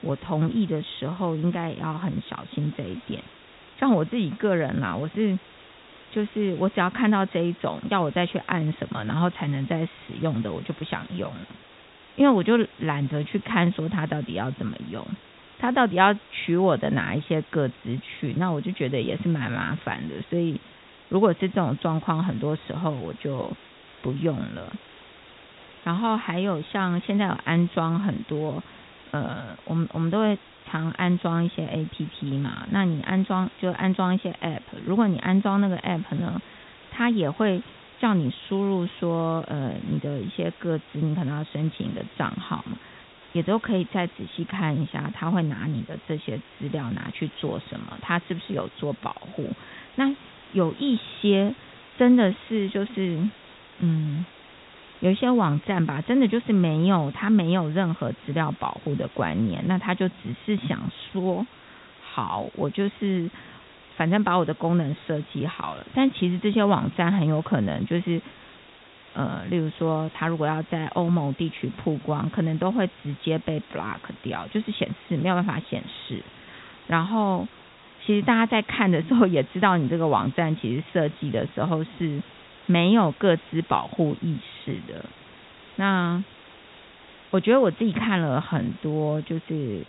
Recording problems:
high frequencies cut off; severe; nothing above 4 kHz
hiss; faint; throughout; 20 dB below the speech

